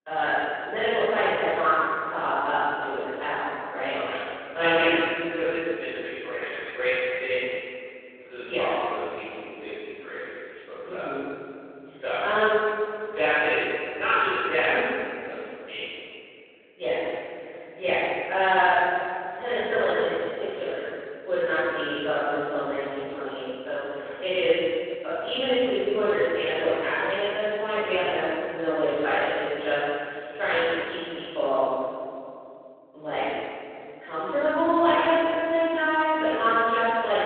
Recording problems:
room echo; strong; dies away in 2.8 s
off-mic speech; far
phone-call audio

